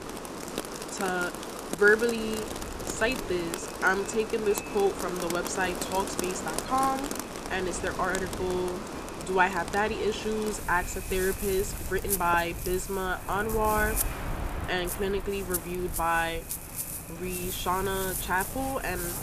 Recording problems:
echo of what is said; faint; throughout; 460 ms later, 25 dB below the speech
rain or running water; loud; throughout; 6 dB below the speech
wind noise on the microphone; occasional gusts; 20 dB below the speech

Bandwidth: 14.5 kHz